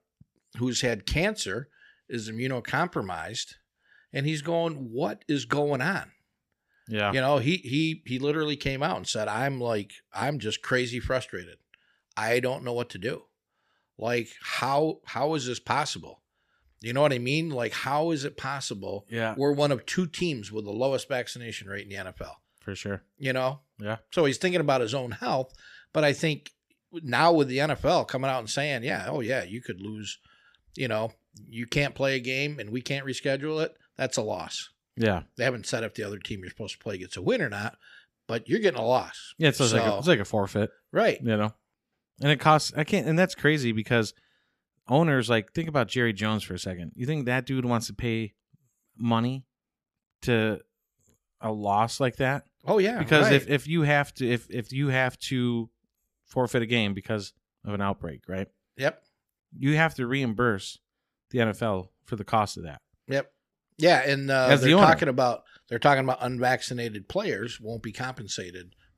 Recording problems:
none

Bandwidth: 14.5 kHz